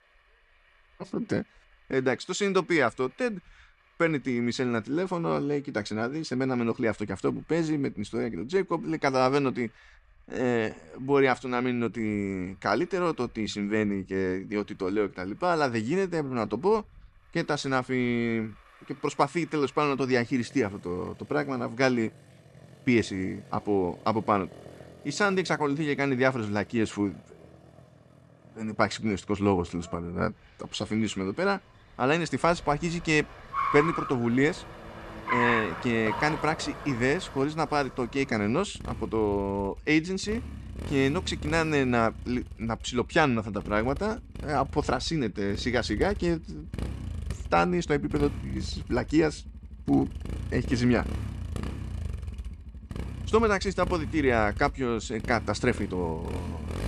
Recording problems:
traffic noise; loud; throughout; 10 dB below the speech

